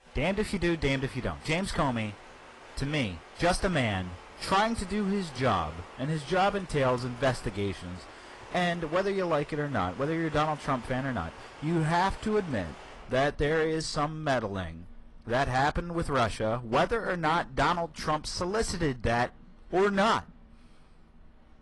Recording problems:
distortion; slight; 5% of the sound clipped
garbled, watery; slightly; nothing above 11 kHz
rain or running water; faint; throughout; 20 dB below the speech

